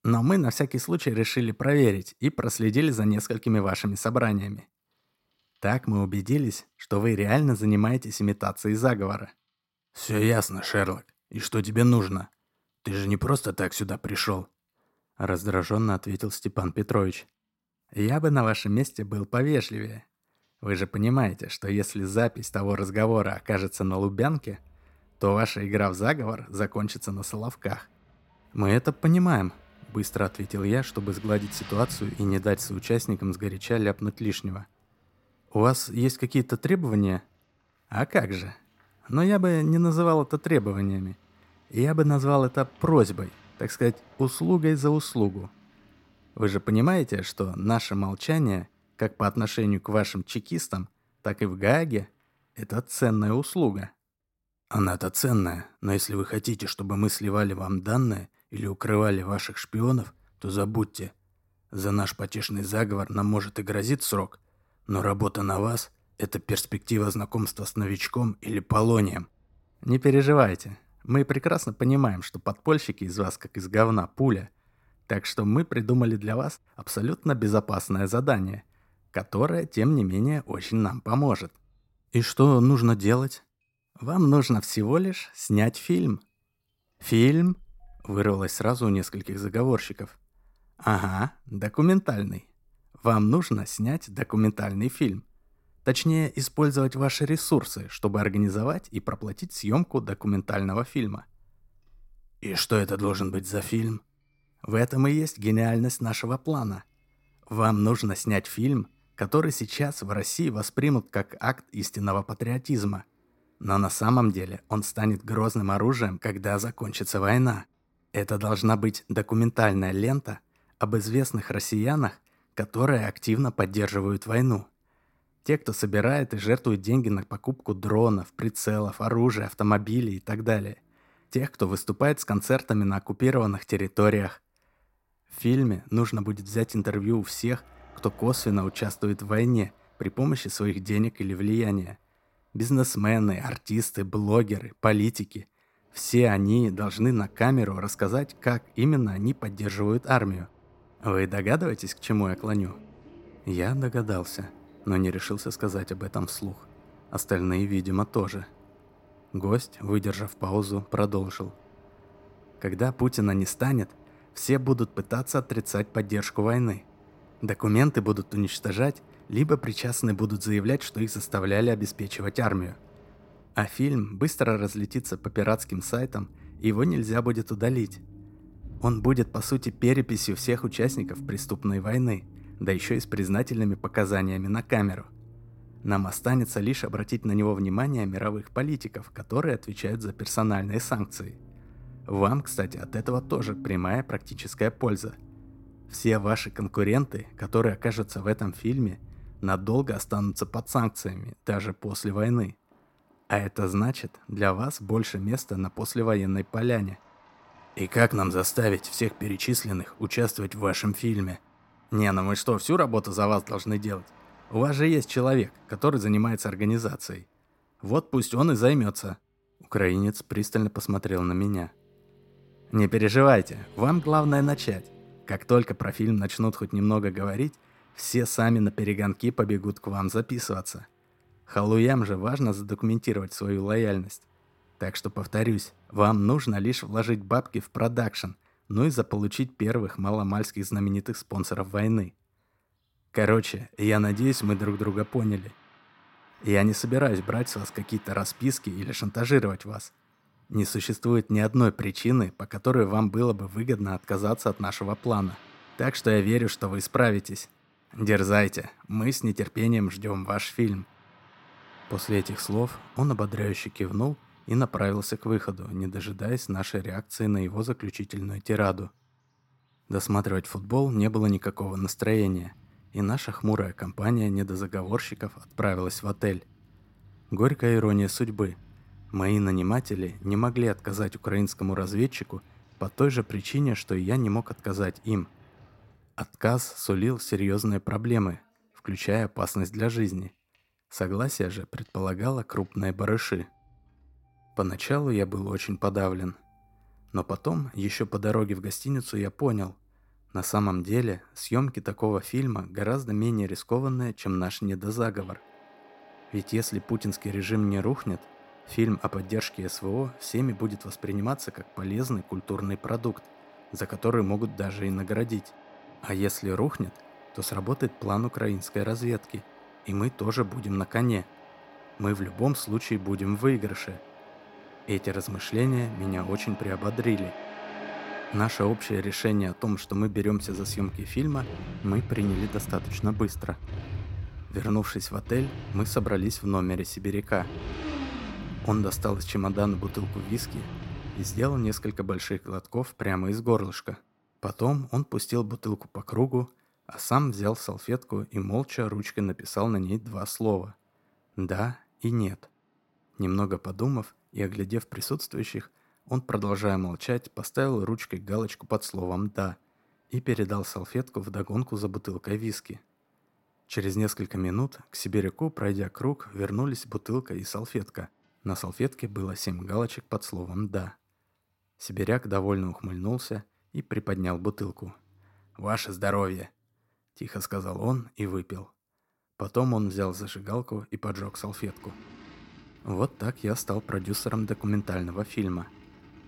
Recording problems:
traffic noise; noticeable; throughout; 20 dB below the speech

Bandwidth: 16.5 kHz